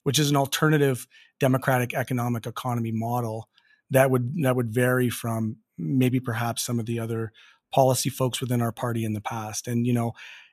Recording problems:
none

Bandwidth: 14.5 kHz